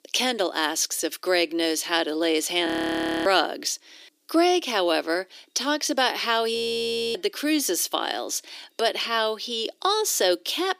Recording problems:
thin; very; fading below 300 Hz
audio freezing; at 2.5 s for 0.5 s and at 6.5 s for 0.5 s

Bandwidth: 15 kHz